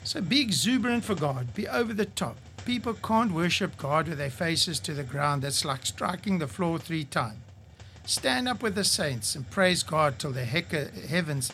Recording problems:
hiss; noticeable; throughout; 20 dB below the speech

